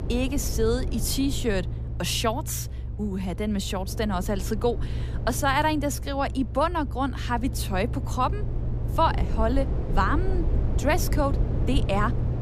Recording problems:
low rumble; noticeable; throughout; 15 dB below the speech

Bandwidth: 14.5 kHz